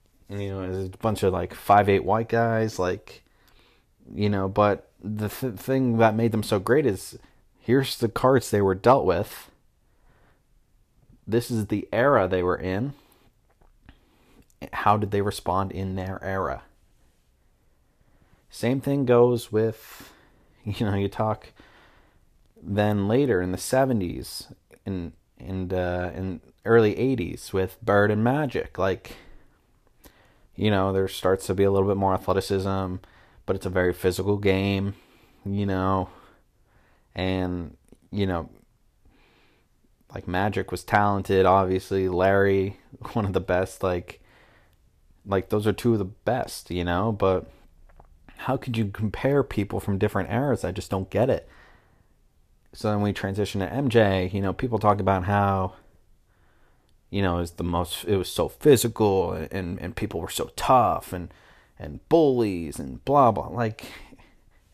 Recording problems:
none

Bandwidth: 14.5 kHz